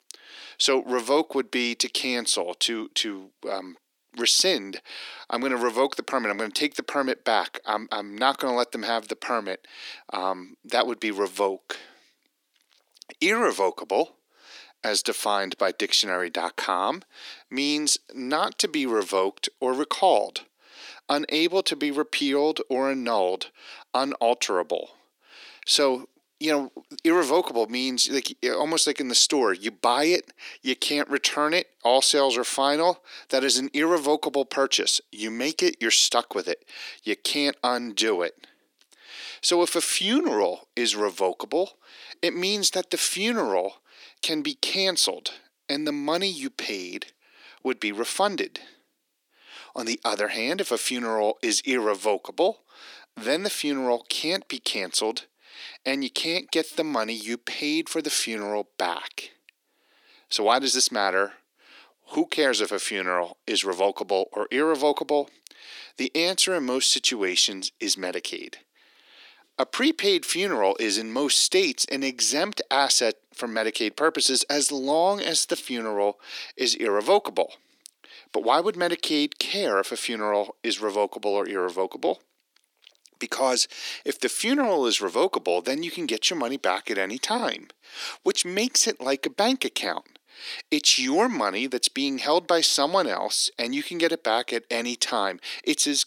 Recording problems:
thin; very; fading below 300 Hz

